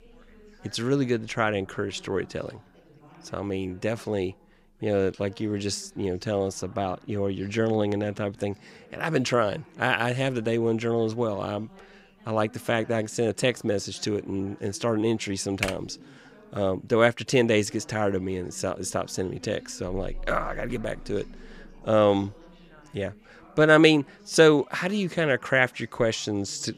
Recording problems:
background chatter; faint; throughout; 3 voices, 25 dB below the speech
keyboard typing; noticeable; at 16 s; peak 5 dB below the speech

